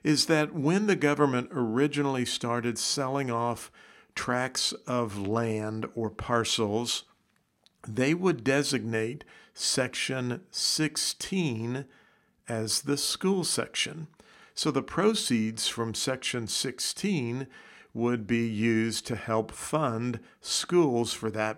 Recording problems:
none

